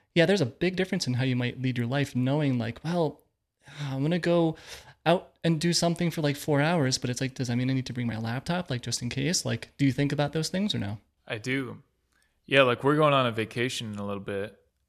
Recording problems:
none

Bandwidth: 14 kHz